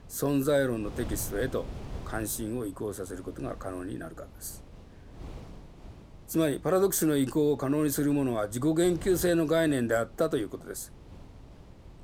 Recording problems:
wind noise on the microphone; occasional gusts; 20 dB below the speech

